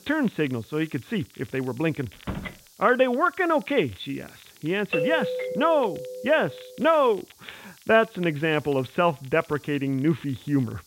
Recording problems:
high frequencies cut off; severe; nothing above 4 kHz
hiss; faint; throughout; 25 dB below the speech
crackle, like an old record; faint; 25 dB below the speech
door banging; noticeable; at 2 s; peak 10 dB below the speech
doorbell; noticeable; from 5 to 6.5 s; peak 1 dB below the speech

